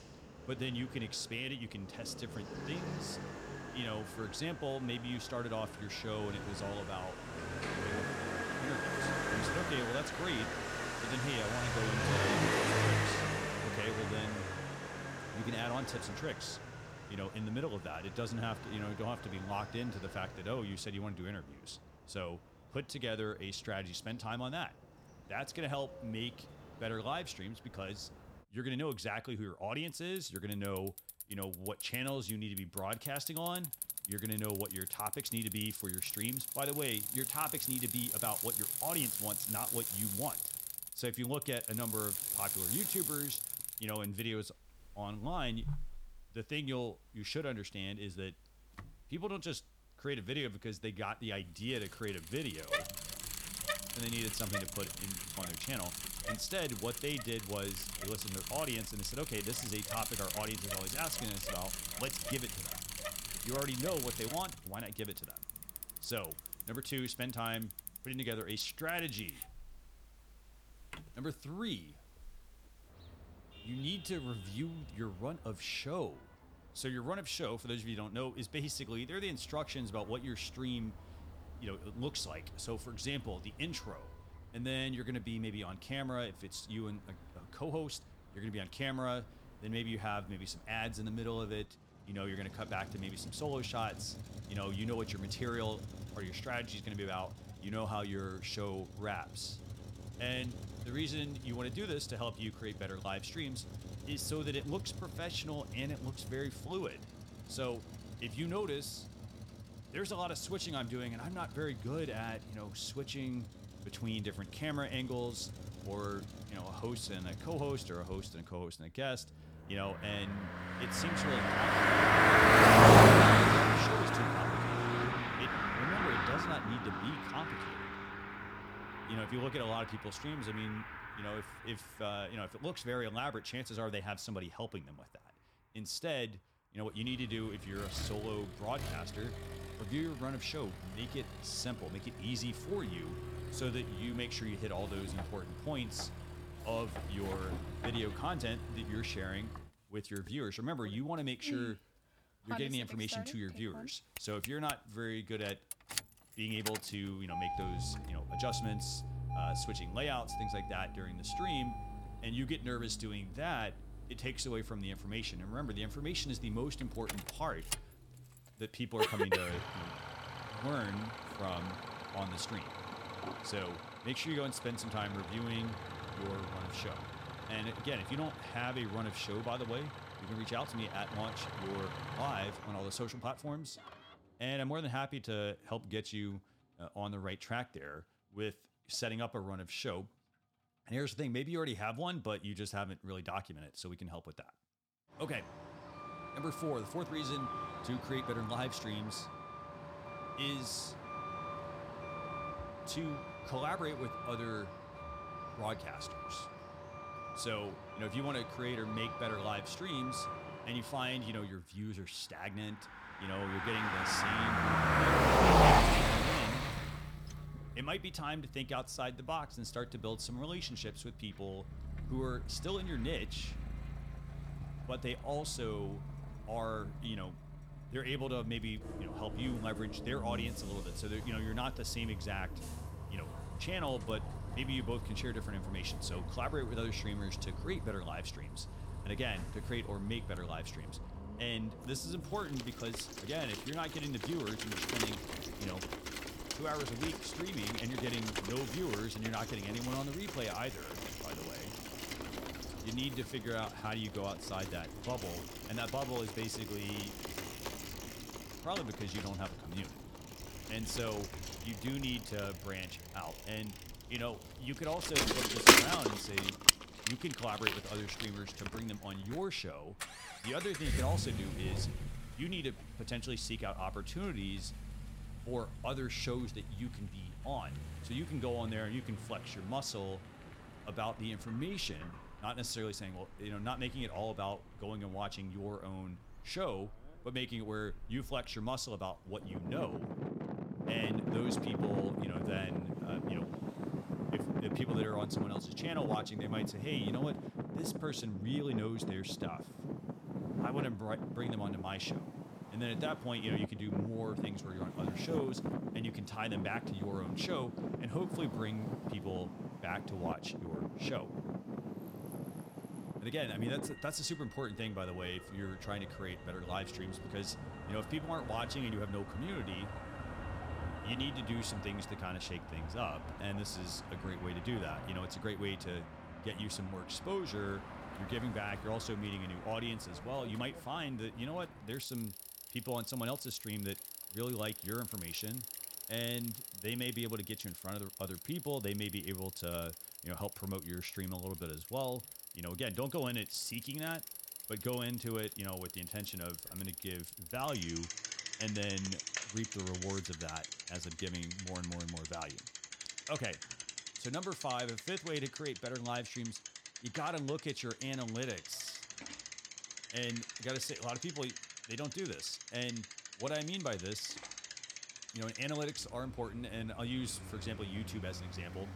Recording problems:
traffic noise; very loud; throughout; 3 dB above the speech

